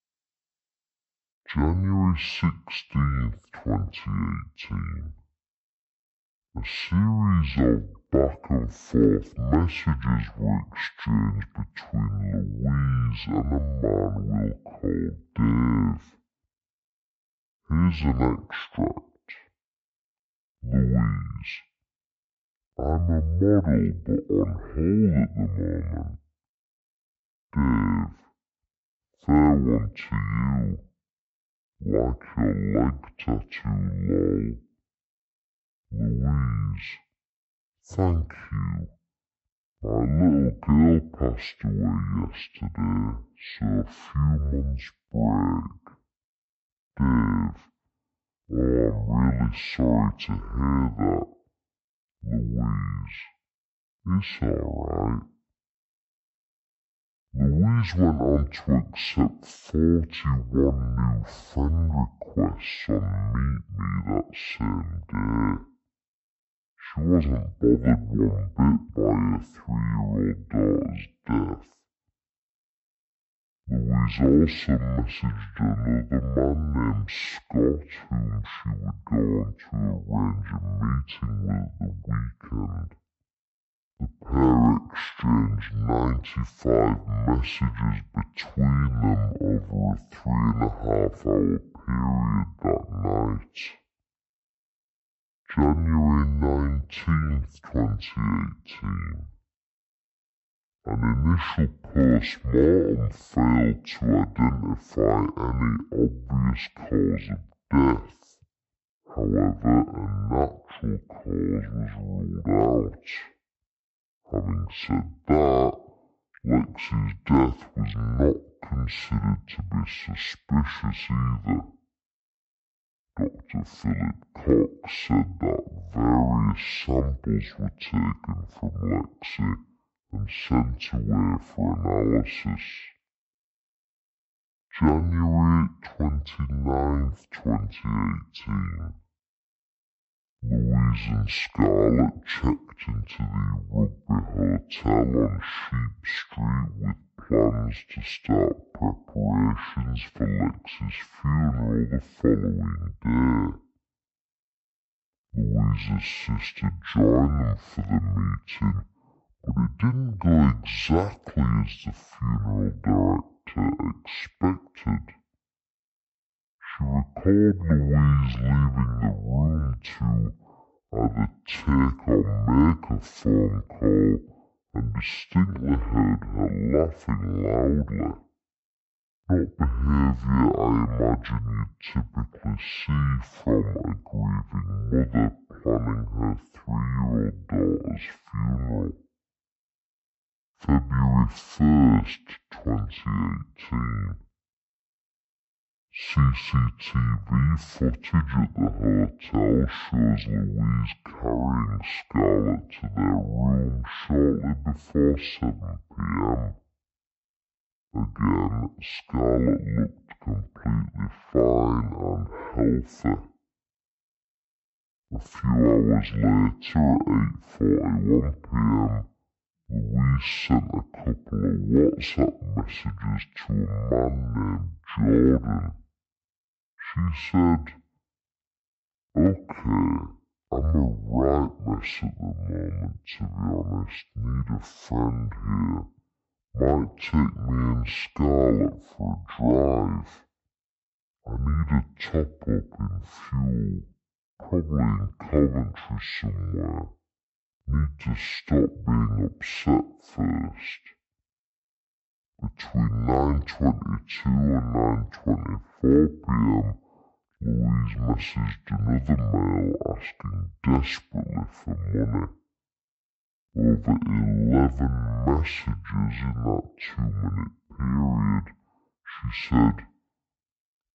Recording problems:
wrong speed and pitch; too slow and too low; 0.5 times normal speed

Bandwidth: 8 kHz